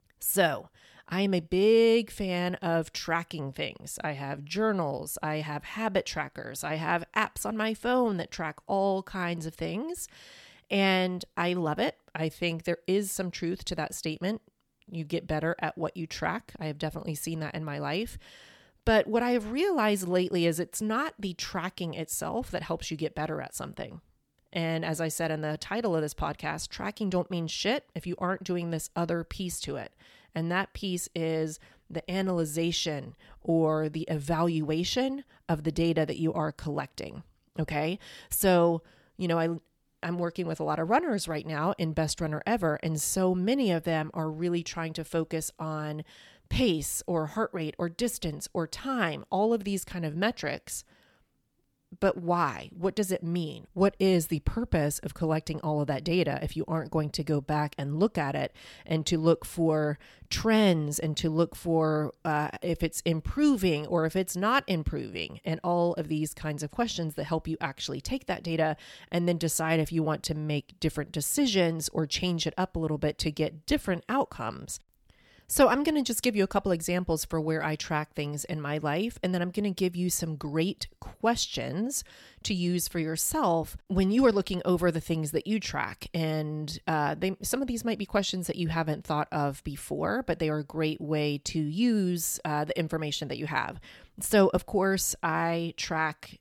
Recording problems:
none

